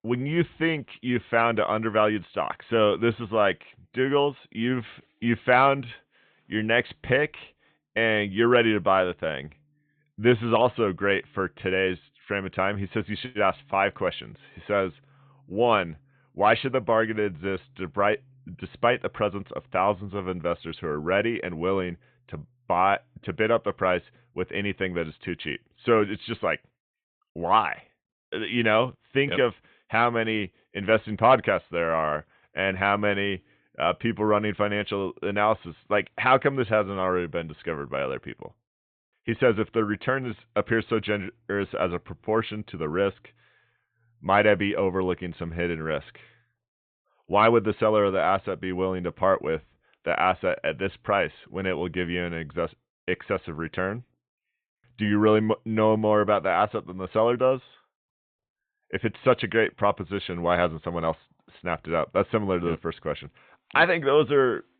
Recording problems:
high frequencies cut off; severe; nothing above 4 kHz

